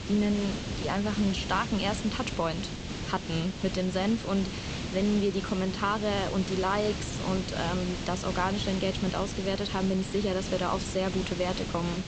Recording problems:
high frequencies cut off; noticeable; nothing above 8 kHz
hiss; loud; throughout; 5 dB below the speech

